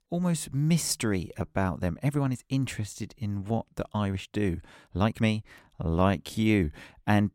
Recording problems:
uneven, jittery; strongly; from 1 to 6.5 s

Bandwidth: 16.5 kHz